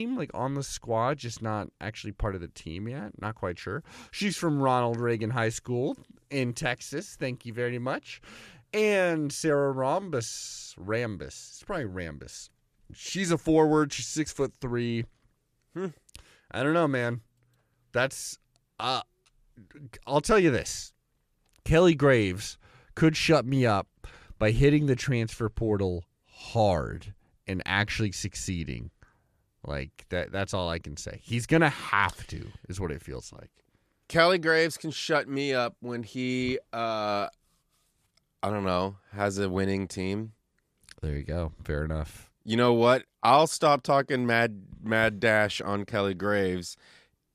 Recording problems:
abrupt cut into speech; at the start

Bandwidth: 14.5 kHz